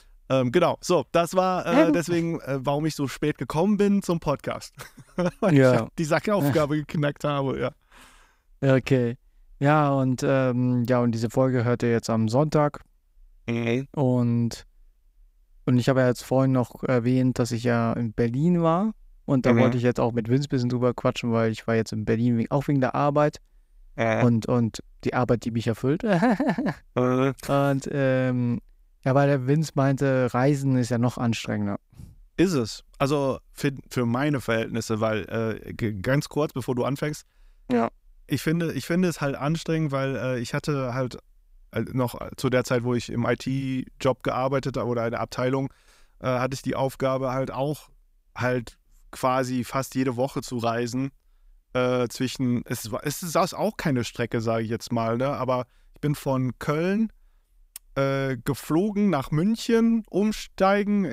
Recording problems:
abrupt cut into speech; at the end

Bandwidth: 15.5 kHz